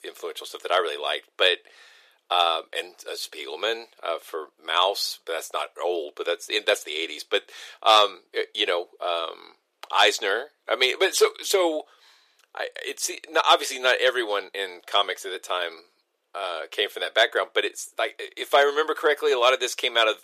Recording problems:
thin; very; fading below 400 Hz

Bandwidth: 14.5 kHz